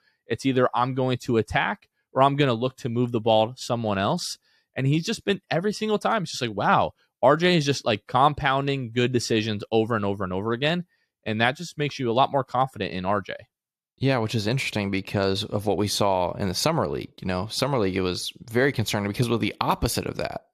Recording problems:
none

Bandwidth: 14.5 kHz